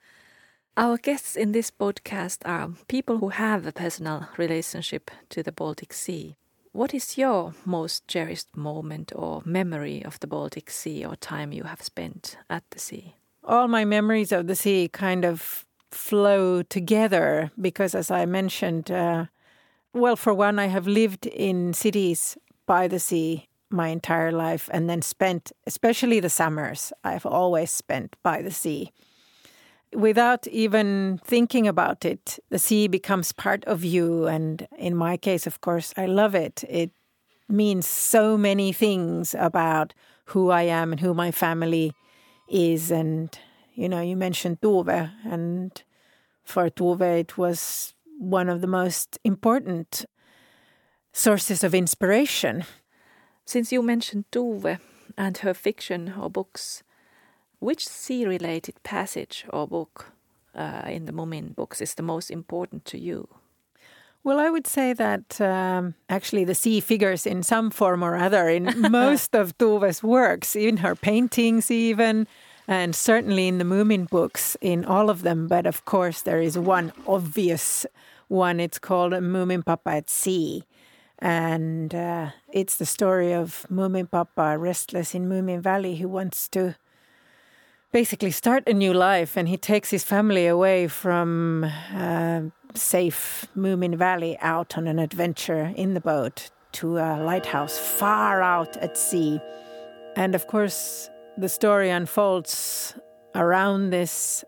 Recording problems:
household noises; faint; throughout; 20 dB below the speech

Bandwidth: 18 kHz